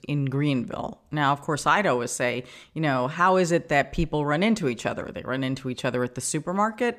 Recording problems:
none

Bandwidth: 14.5 kHz